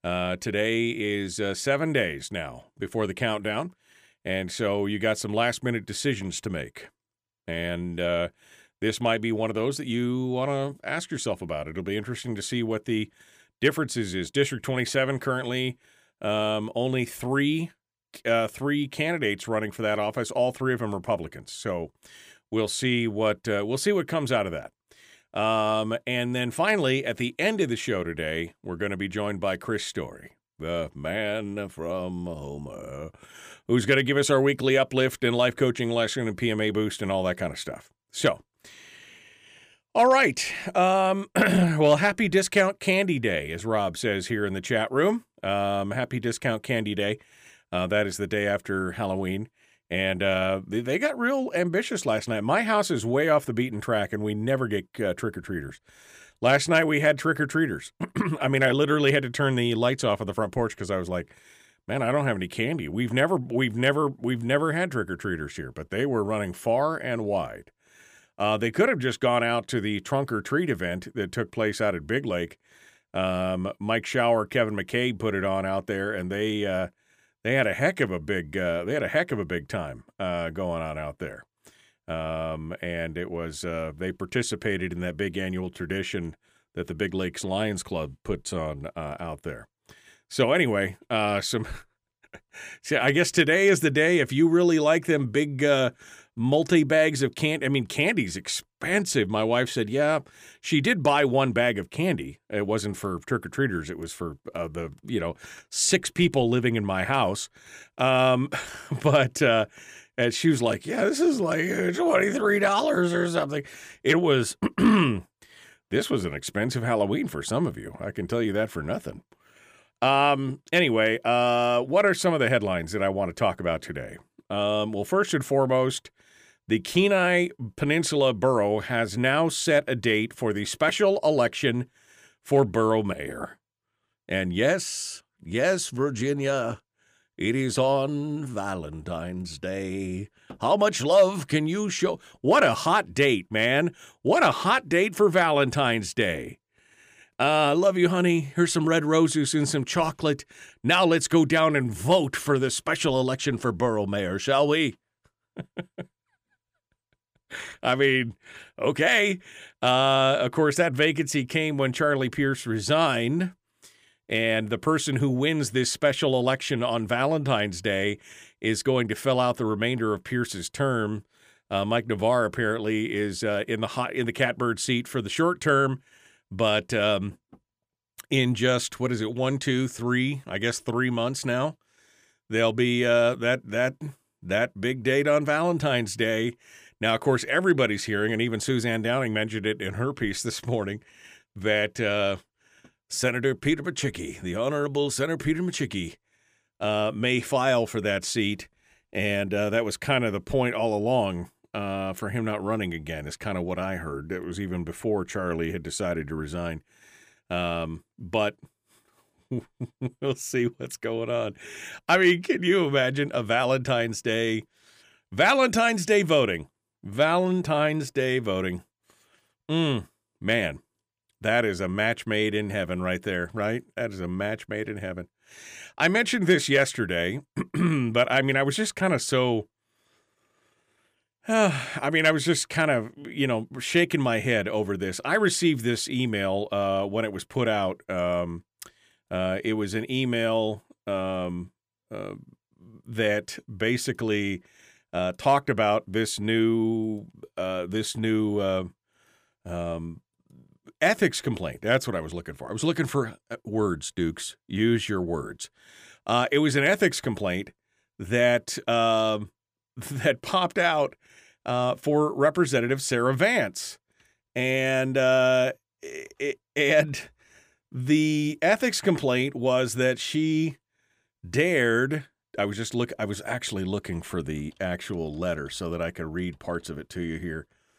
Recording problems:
none

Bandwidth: 15 kHz